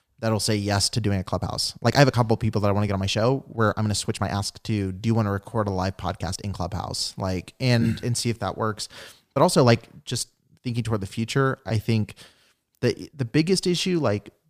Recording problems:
uneven, jittery; strongly; from 1 to 14 s

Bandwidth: 15 kHz